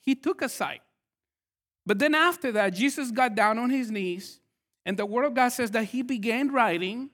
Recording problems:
none

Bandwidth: 17.5 kHz